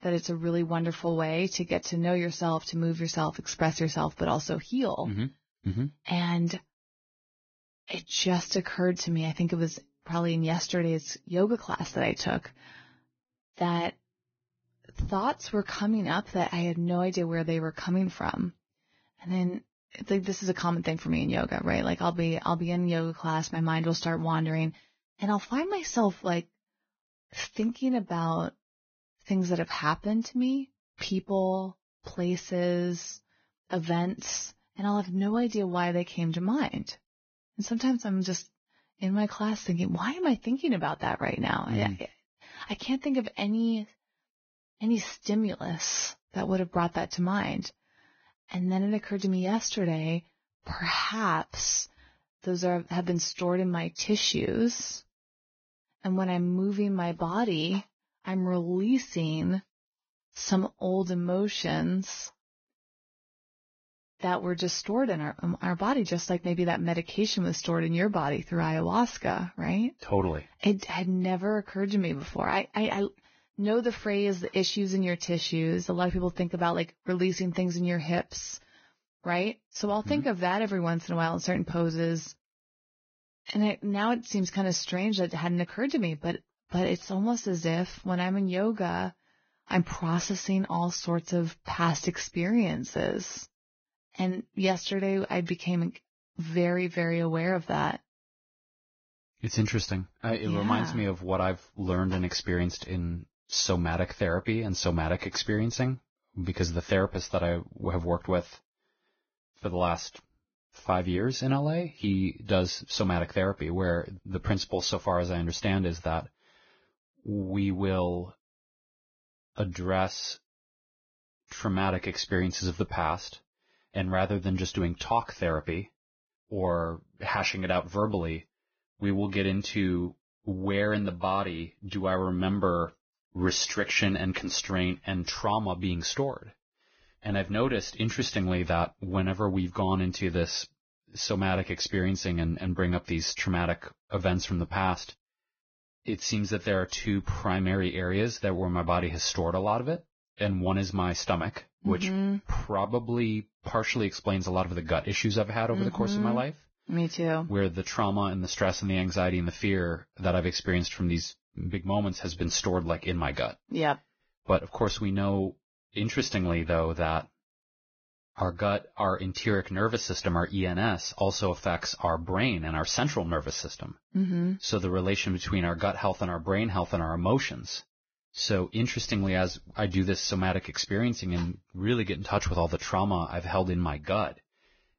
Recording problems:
garbled, watery; badly; nothing above 6.5 kHz

